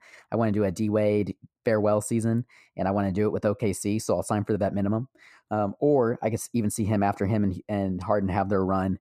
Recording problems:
muffled; slightly; fading above 2 kHz

